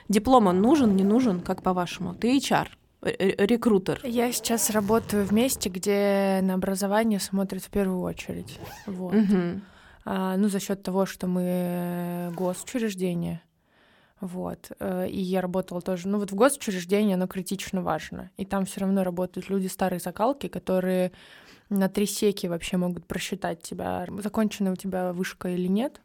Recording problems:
household noises; noticeable; throughout; 20 dB below the speech

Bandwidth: 17.5 kHz